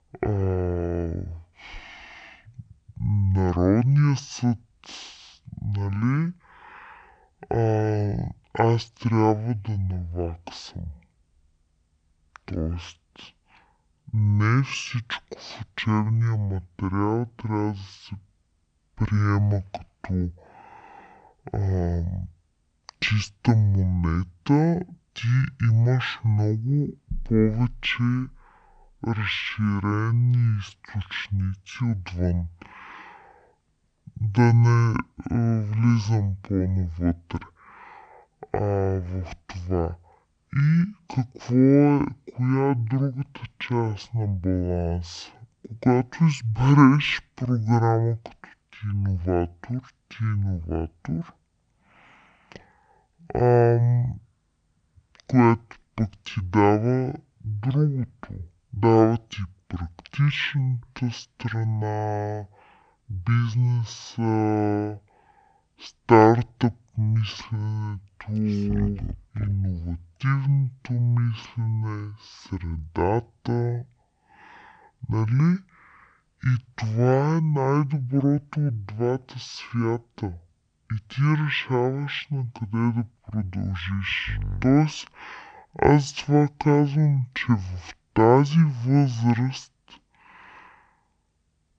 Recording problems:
wrong speed and pitch; too slow and too low; 0.5 times normal speed

